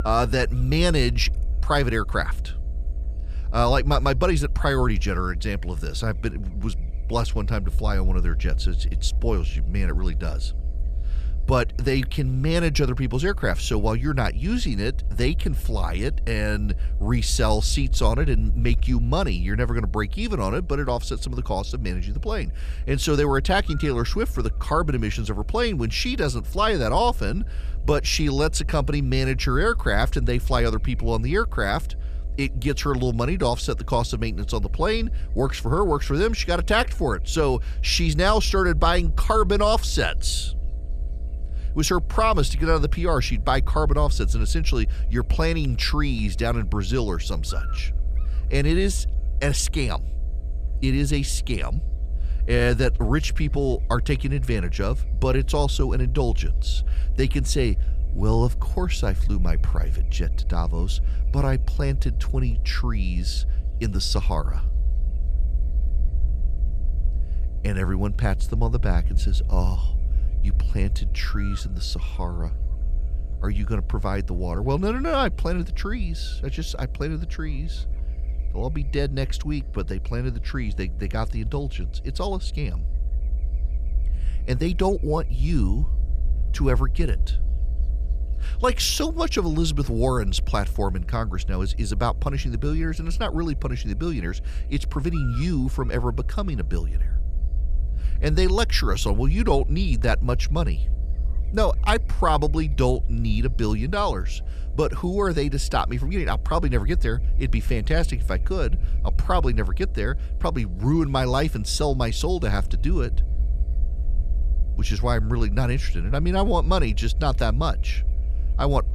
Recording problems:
electrical hum; faint; throughout; 60 Hz, 25 dB below the speech
low rumble; faint; throughout; 25 dB below the speech

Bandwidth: 14.5 kHz